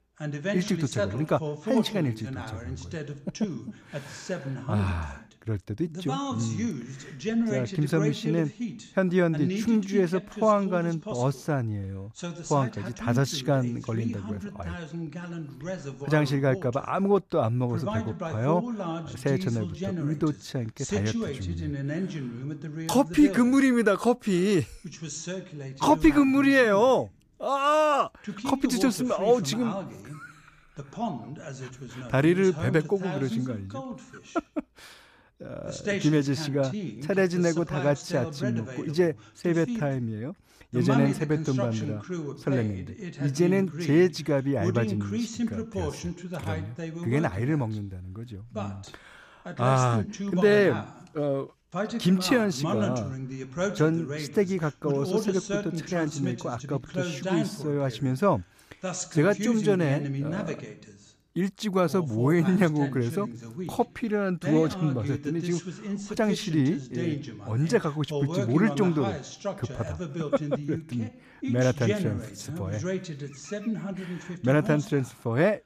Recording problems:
voice in the background; loud; throughout; 8 dB below the speech

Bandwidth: 14.5 kHz